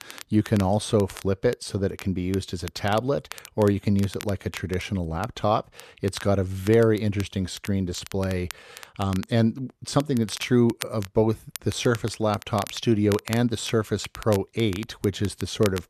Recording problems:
crackle, like an old record; noticeable; 15 dB below the speech

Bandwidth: 13.5 kHz